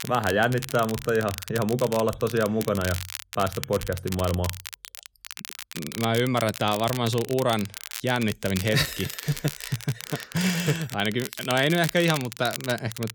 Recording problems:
crackle, like an old record; noticeable; 10 dB below the speech

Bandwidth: 18.5 kHz